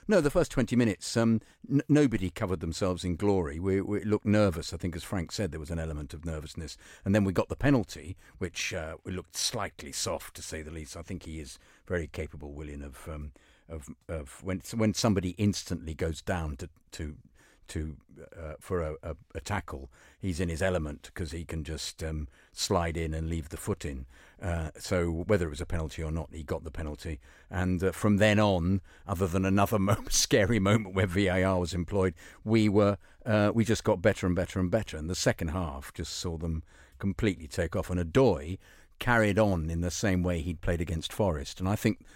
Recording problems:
none

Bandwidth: 16 kHz